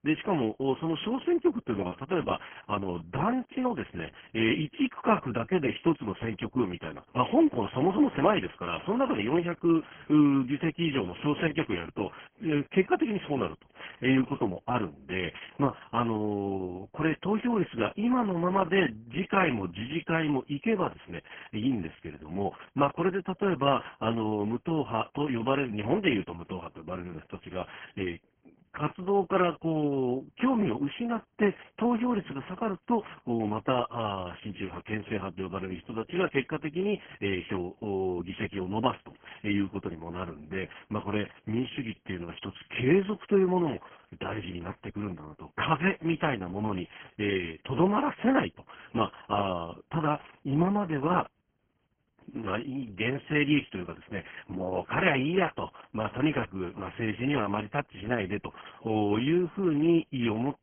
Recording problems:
garbled, watery; badly
high frequencies cut off; severe; nothing above 3.5 kHz

